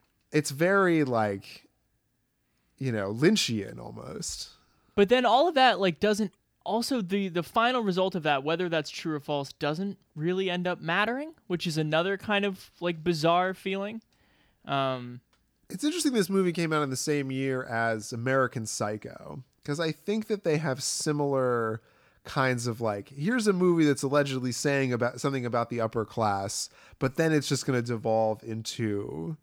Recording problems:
none

